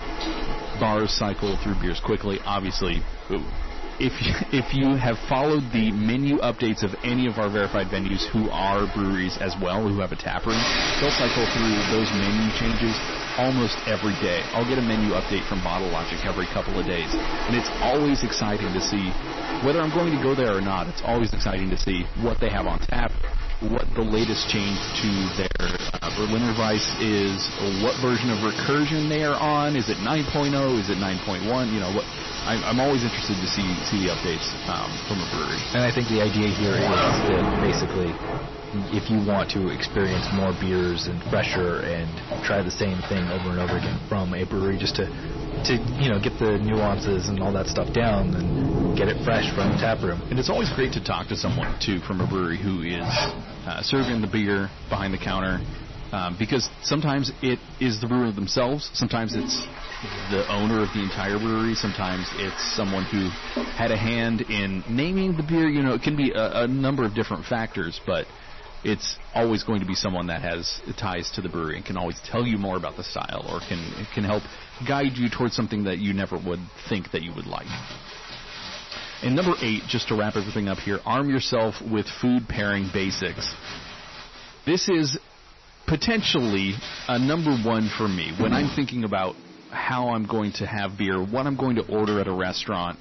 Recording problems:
distortion; slight; 7% of the sound clipped
garbled, watery; slightly; nothing above 6 kHz
household noises; loud; throughout; 7 dB below the speech
rain or running water; loud; throughout; 7 dB below the speech
hiss; faint; throughout; 25 dB below the speech

